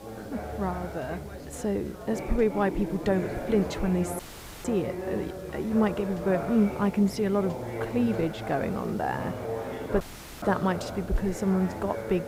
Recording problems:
muffled; slightly; fading above 2.5 kHz
background chatter; loud; throughout; 4 voices, 8 dB below the speech
electrical hum; faint; throughout; 60 Hz, 20 dB below the speech
hiss; faint; throughout; 25 dB below the speech
audio cutting out; at 4 s and at 10 s

